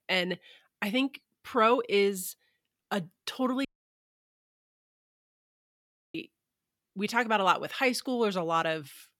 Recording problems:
audio cutting out; at 3.5 s for 2.5 s

